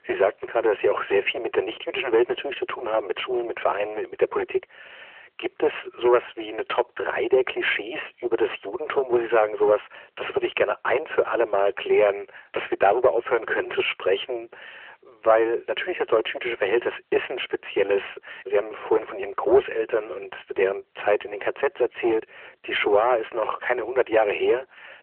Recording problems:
phone-call audio; nothing above 3 kHz
distortion; slight; 15 dB below the speech

